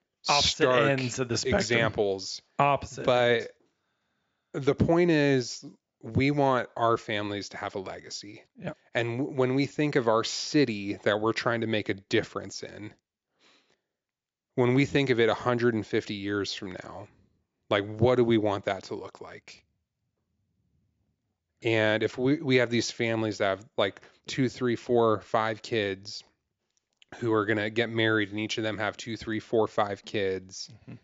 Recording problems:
high frequencies cut off; noticeable; nothing above 7.5 kHz

